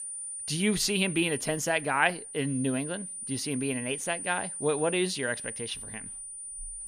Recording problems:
high-pitched whine; loud; throughout; 9.5 kHz, 7 dB below the speech

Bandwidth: 15 kHz